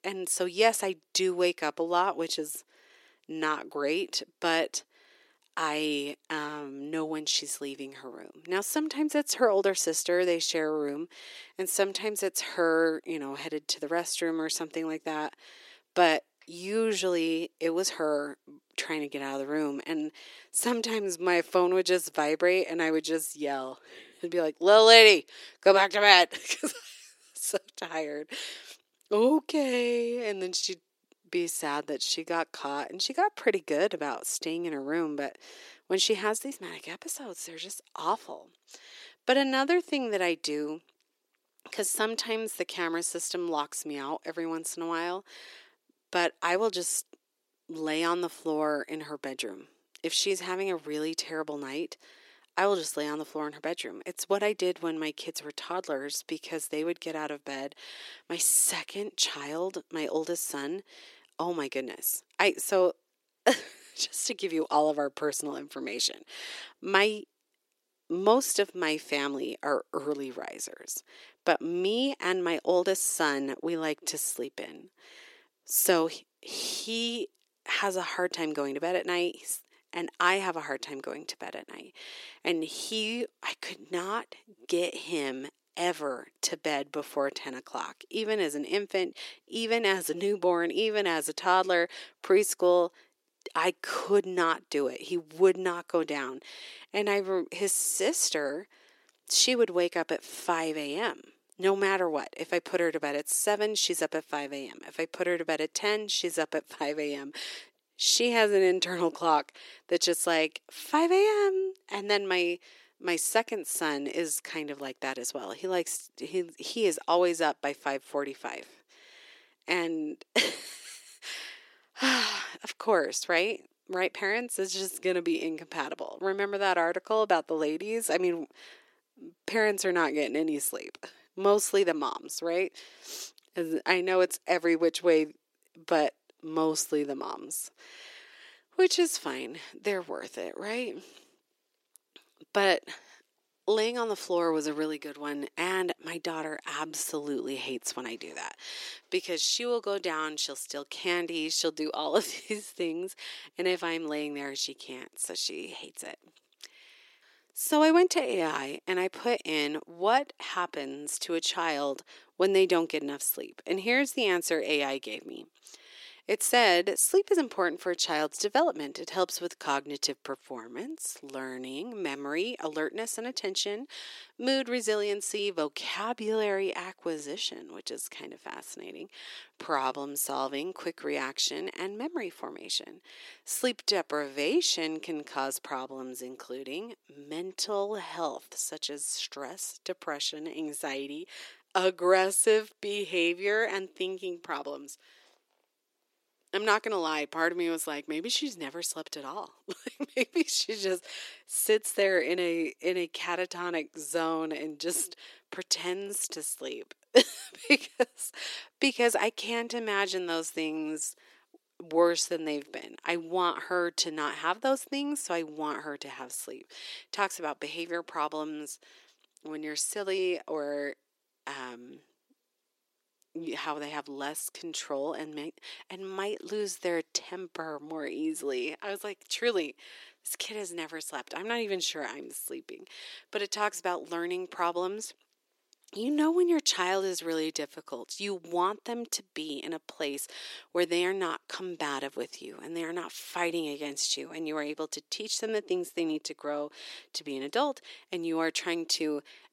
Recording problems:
thin; somewhat; fading below 350 Hz

